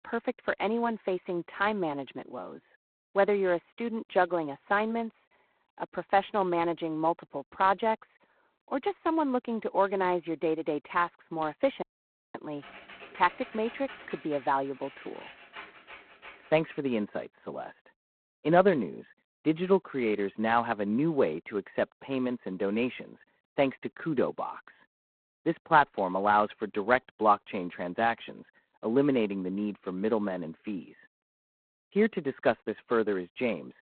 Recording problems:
phone-call audio; poor line; nothing above 4 kHz
muffled; very slightly; fading above 2 kHz
audio cutting out; at 12 s for 0.5 s
keyboard typing; faint; from 13 to 17 s; peak 15 dB below the speech

